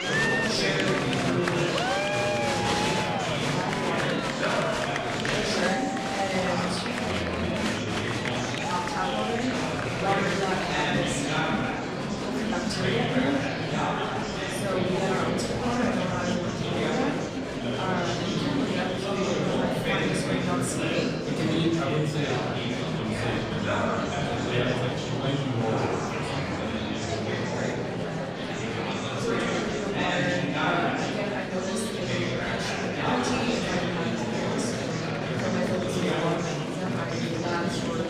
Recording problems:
off-mic speech; far
room echo; noticeable; dies away in 0.8 s
murmuring crowd; very loud; throughout; 3 dB above the speech
background music; faint; throughout; 25 dB below the speech

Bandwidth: 14.5 kHz